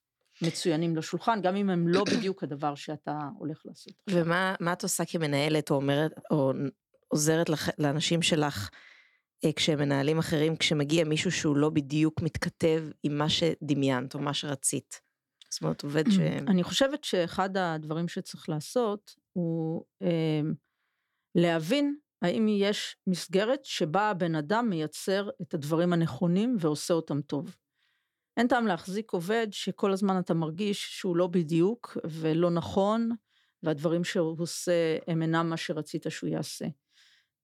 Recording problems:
none

